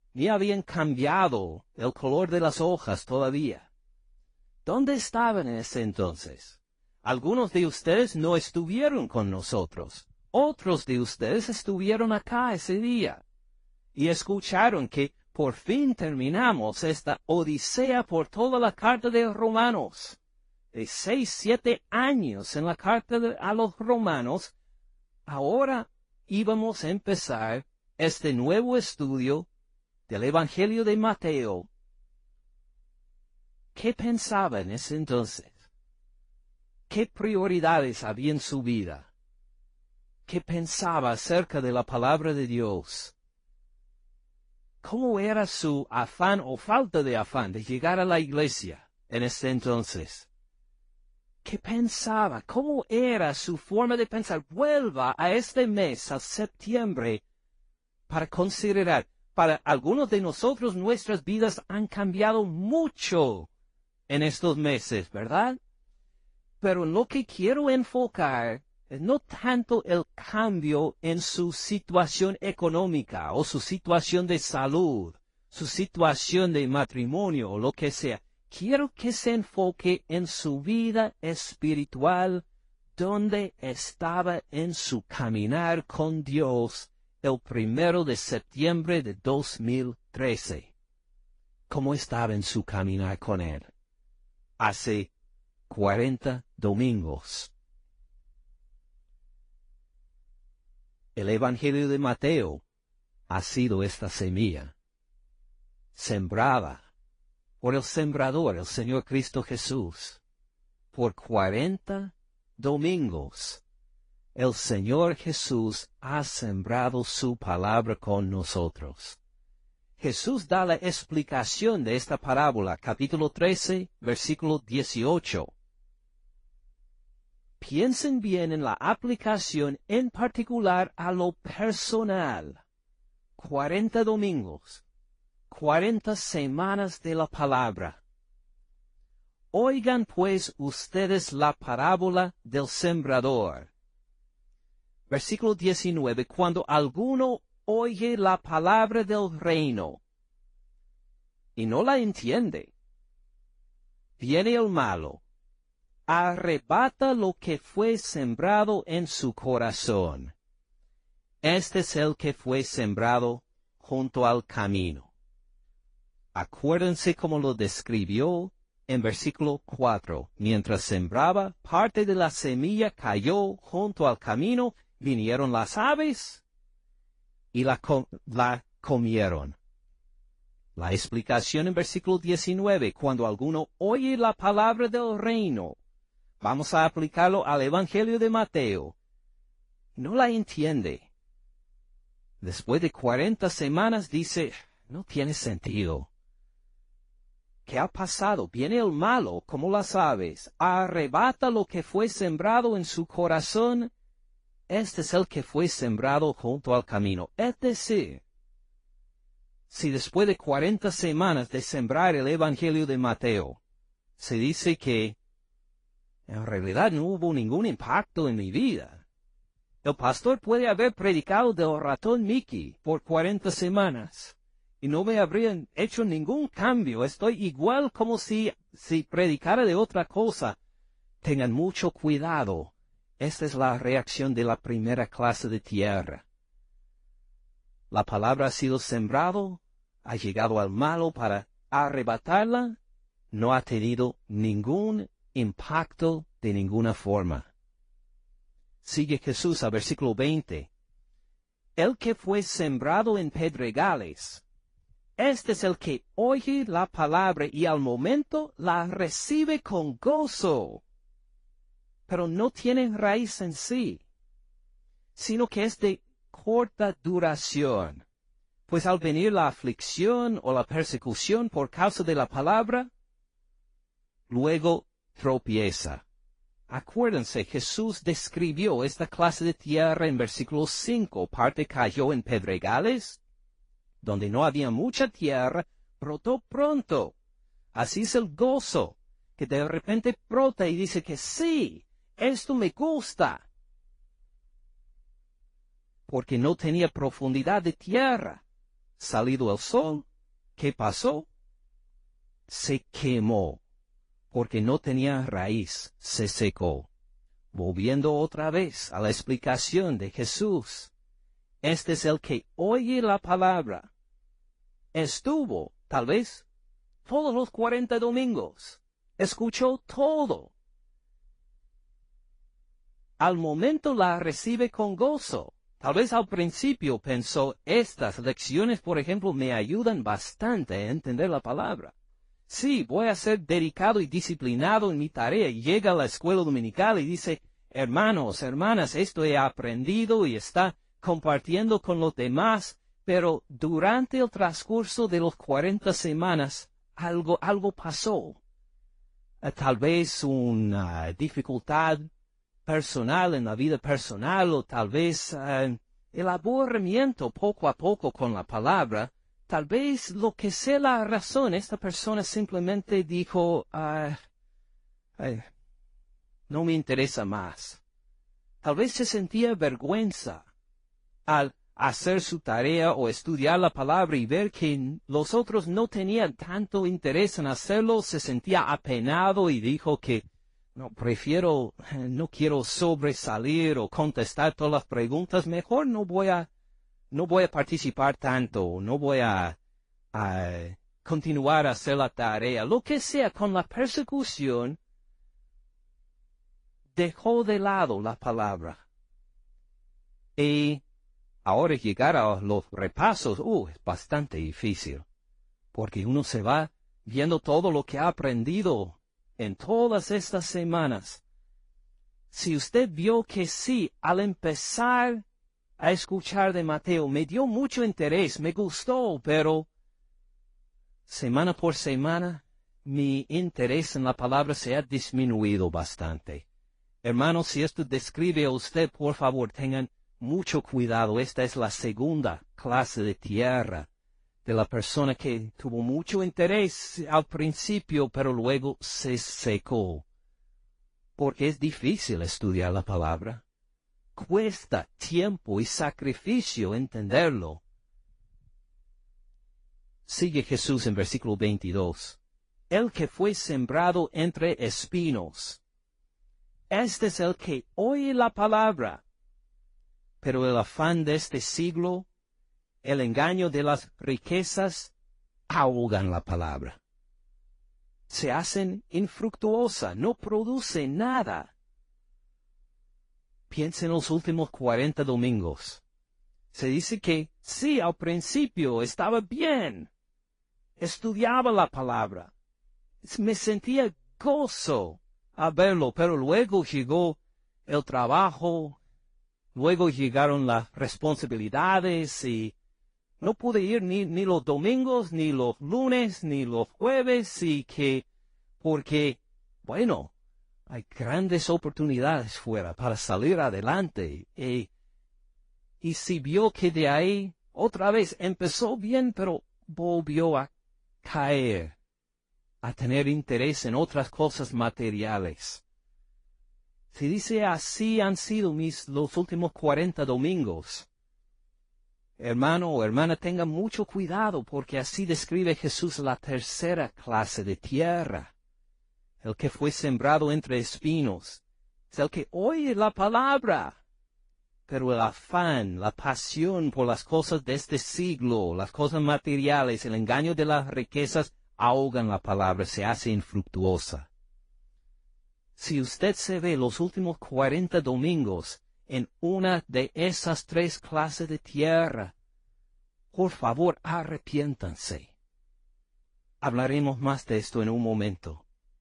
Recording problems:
garbled, watery; slightly; nothing above 10.5 kHz

